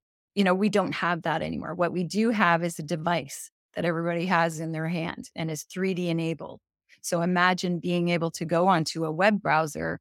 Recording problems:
none

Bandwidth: 17 kHz